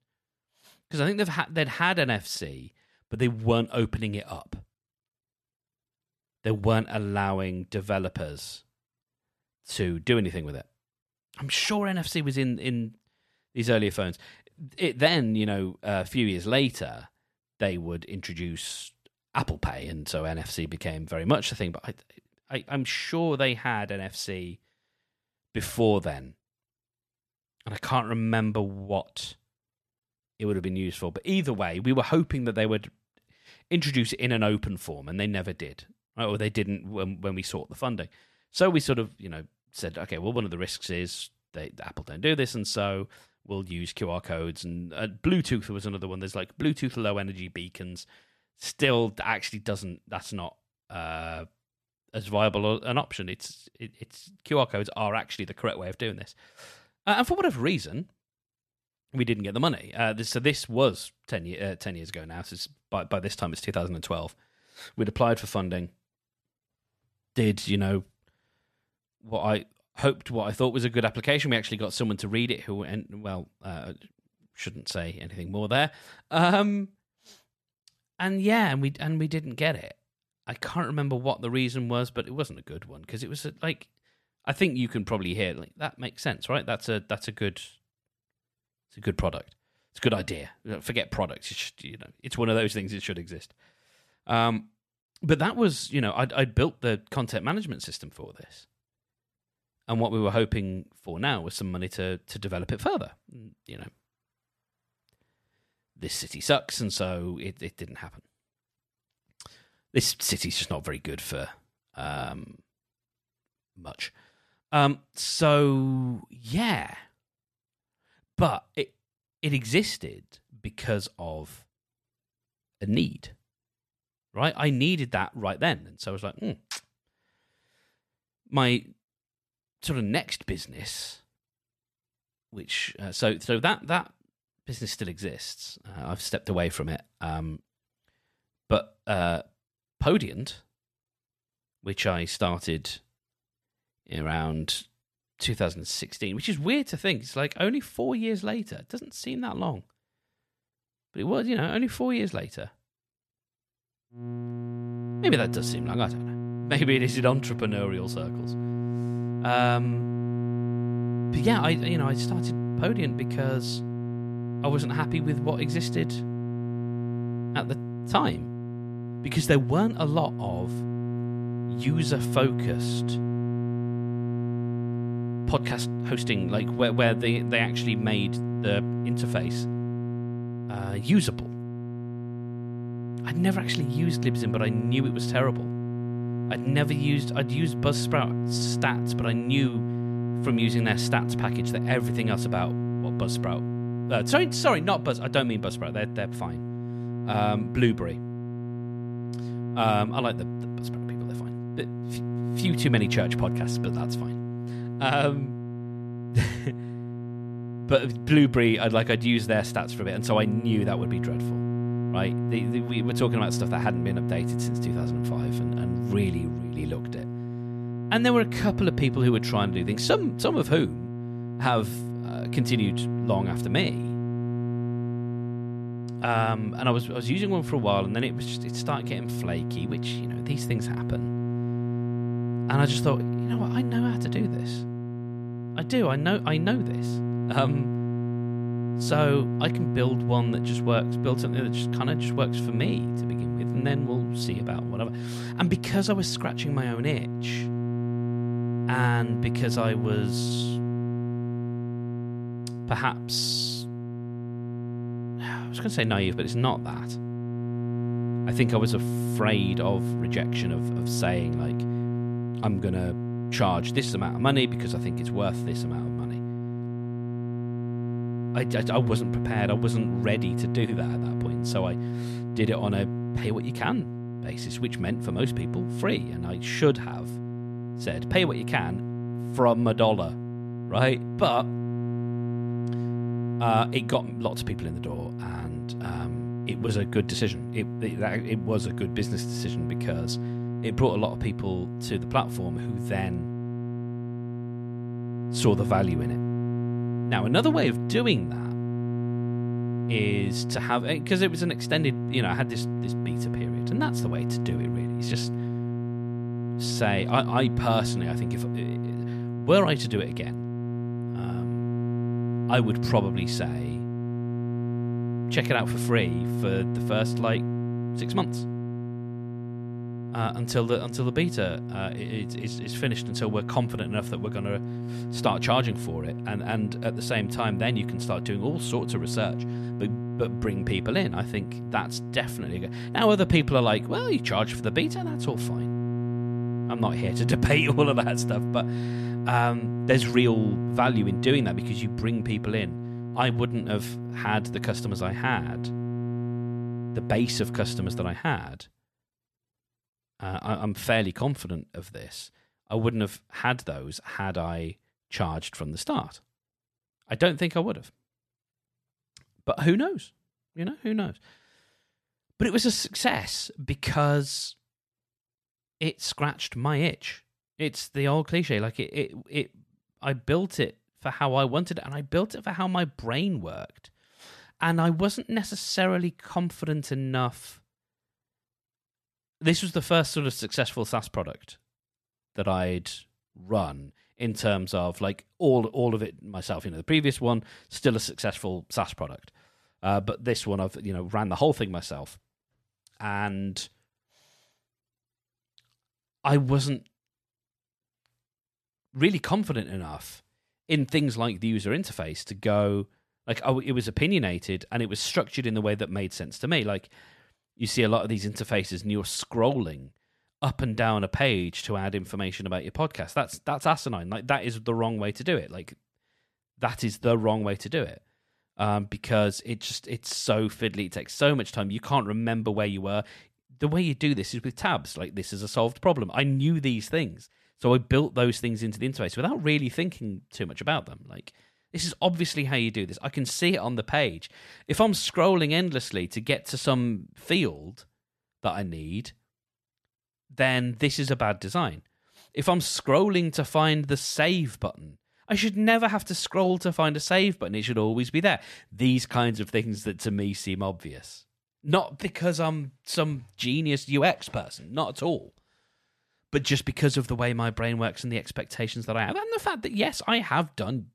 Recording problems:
electrical hum; loud; from 2:34 to 5:48; 60 Hz, 9 dB below the speech

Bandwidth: 14 kHz